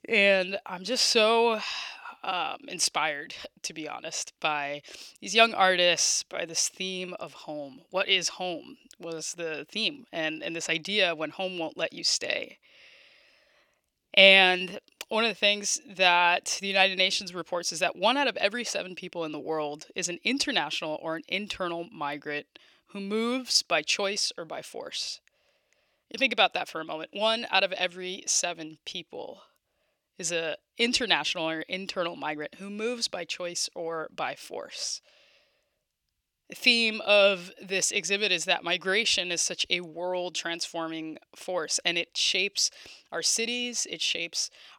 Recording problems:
thin; very slightly; fading below 750 Hz

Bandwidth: 17.5 kHz